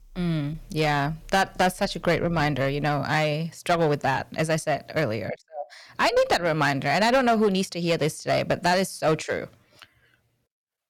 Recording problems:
distortion; slight; 5% of the sound clipped

